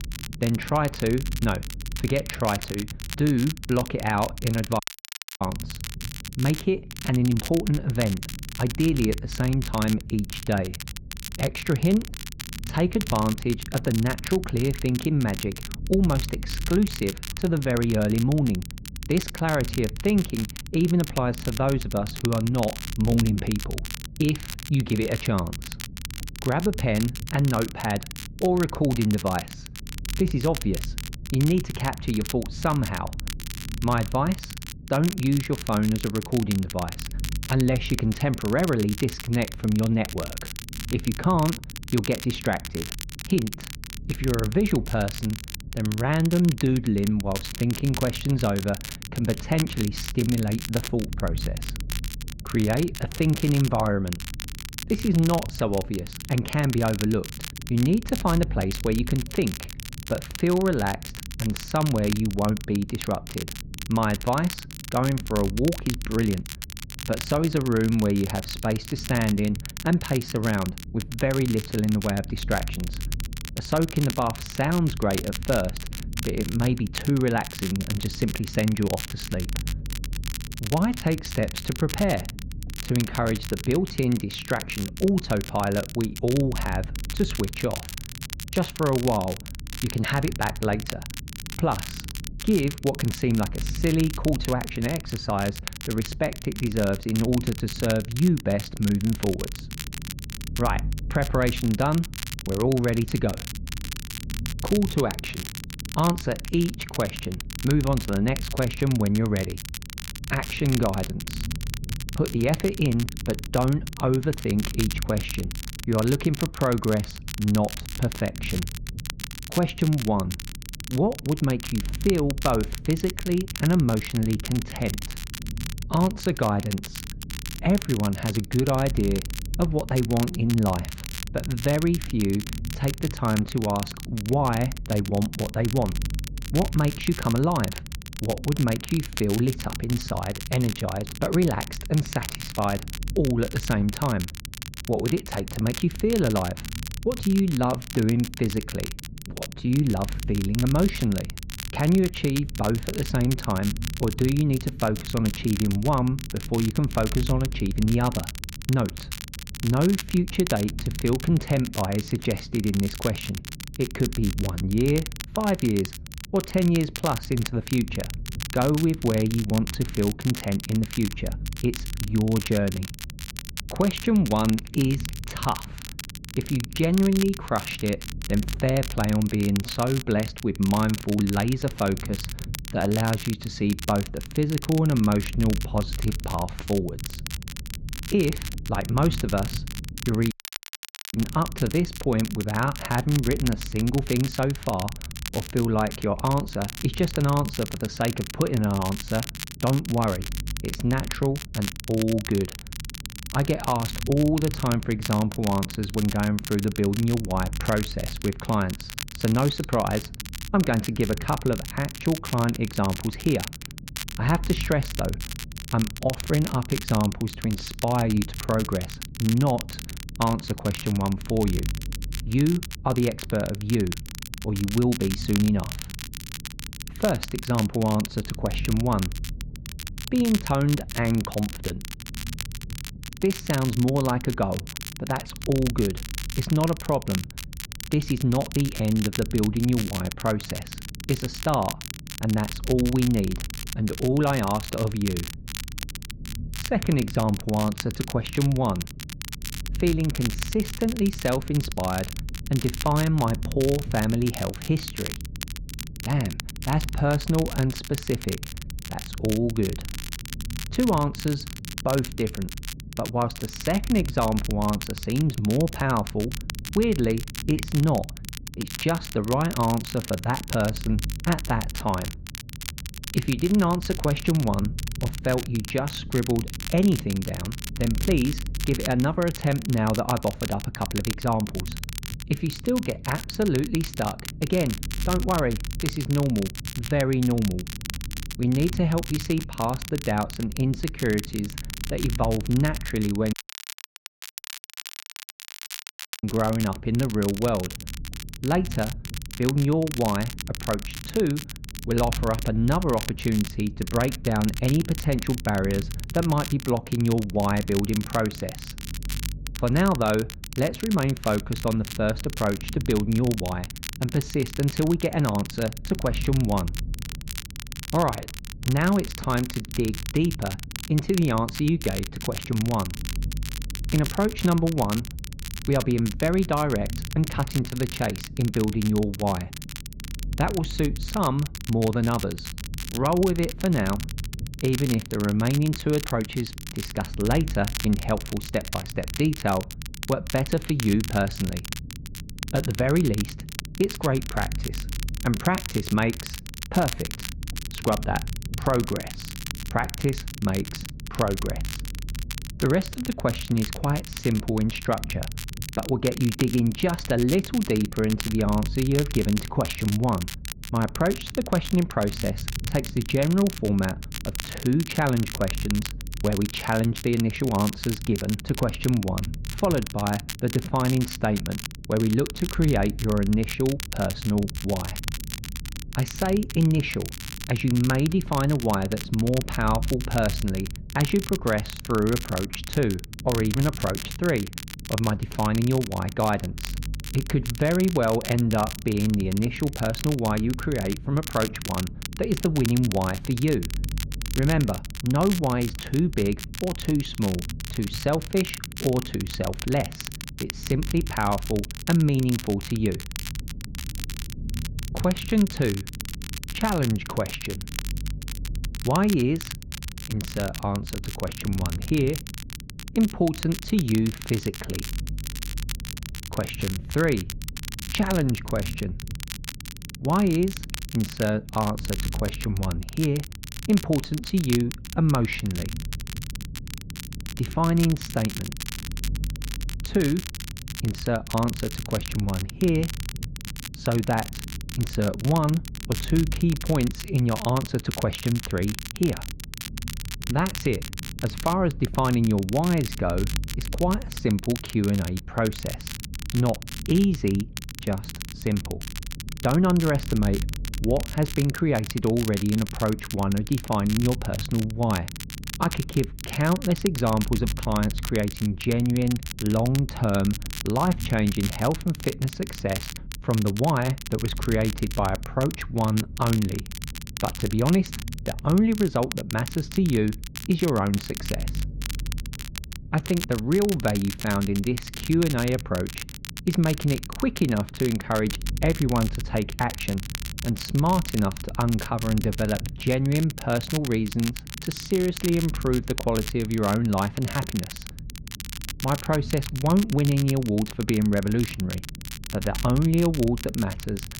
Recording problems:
muffled; slightly; fading above 2.5 kHz
crackle, like an old record; noticeable; 10 dB below the speech
low rumble; faint; throughout; 20 dB below the speech
audio cutting out; at 5 s for 0.5 s, at 3:10 for 1 s and at 4:53 for 3 s

